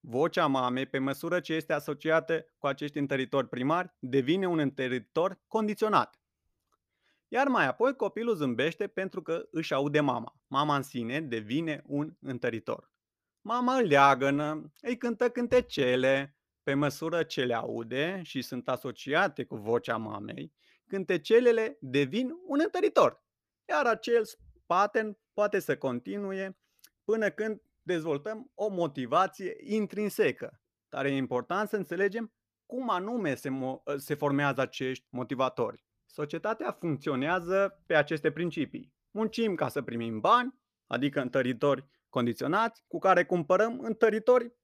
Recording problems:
none

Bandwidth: 14.5 kHz